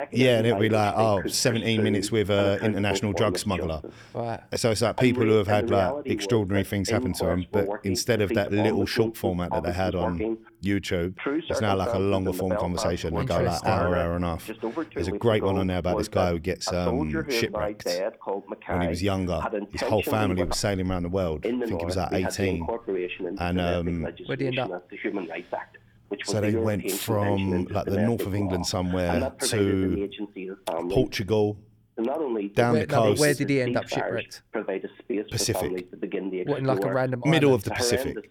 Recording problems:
voice in the background; loud; throughout; 5 dB below the speech

